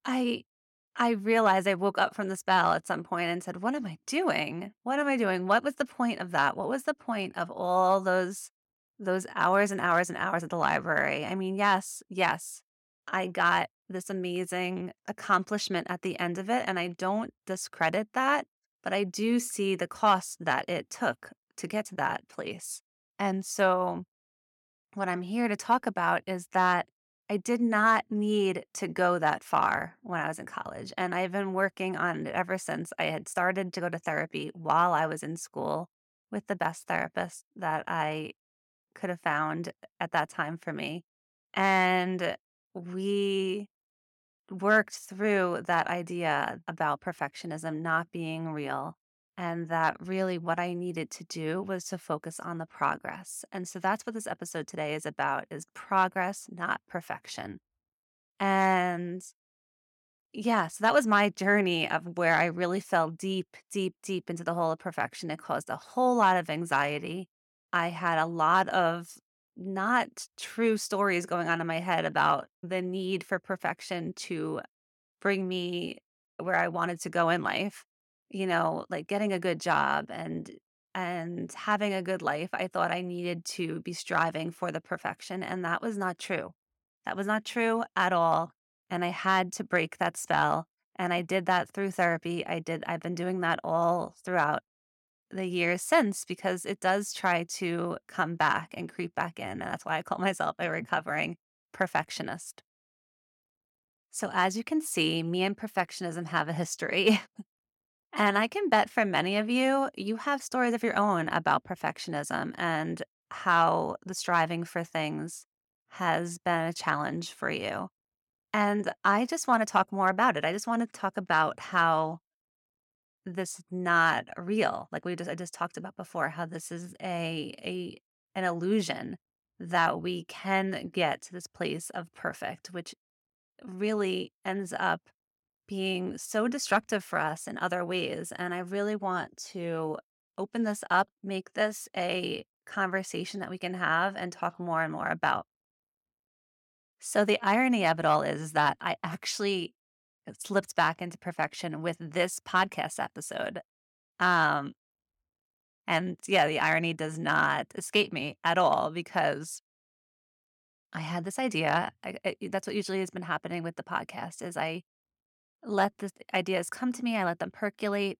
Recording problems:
none

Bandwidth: 17 kHz